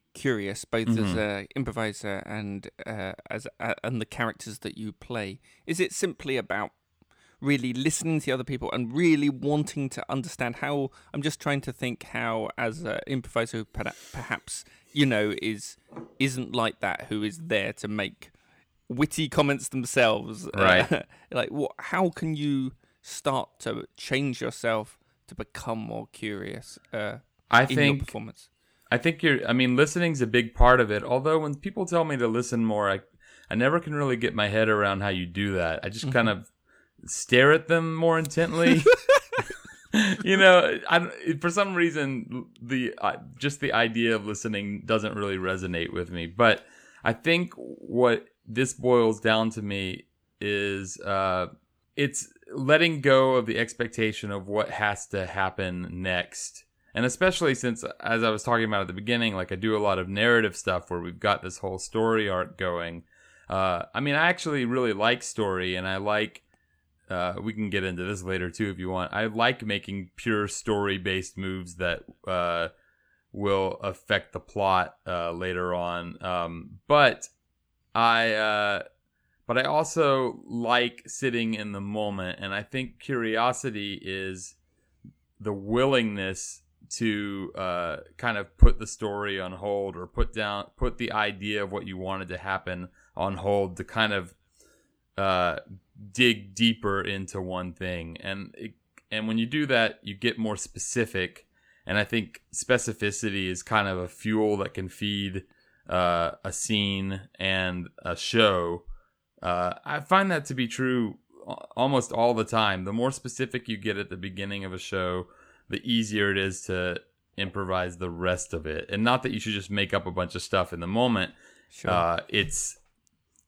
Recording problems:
none

